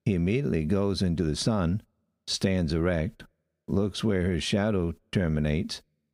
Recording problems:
squashed, flat; somewhat

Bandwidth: 15.5 kHz